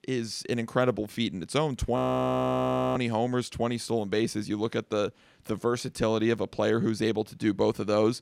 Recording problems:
audio freezing; at 2 s for 1 s

